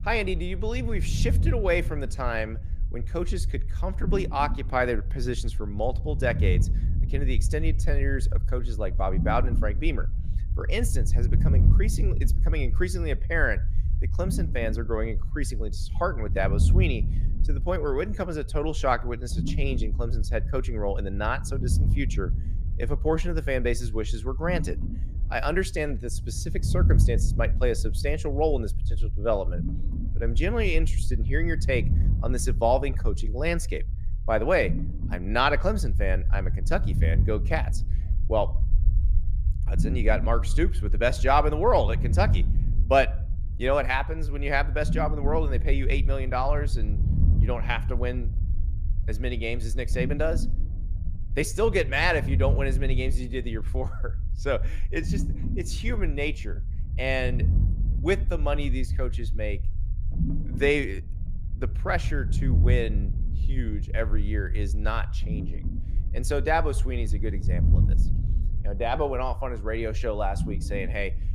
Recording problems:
low rumble; noticeable; throughout; 15 dB below the speech

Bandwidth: 15 kHz